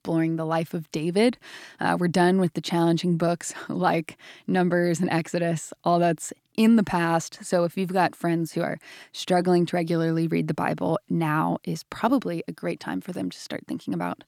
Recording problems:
none

